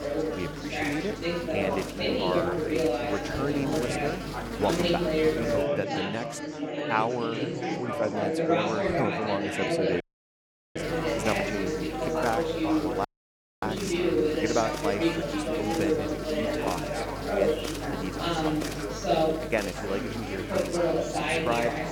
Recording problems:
chatter from many people; very loud; throughout; 4 dB above the speech
electrical hum; loud; until 5.5 s and from 11 s on; 50 Hz, 7 dB below the speech
household noises; very faint; throughout; 30 dB below the speech
audio cutting out; at 10 s for 1 s and at 13 s for 0.5 s

